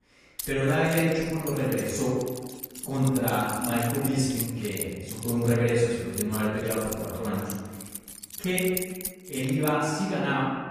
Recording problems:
room echo; strong; dies away in 1.3 s
off-mic speech; far
garbled, watery; slightly; nothing above 14.5 kHz
jangling keys; noticeable; until 9.5 s; peak 2 dB below the speech

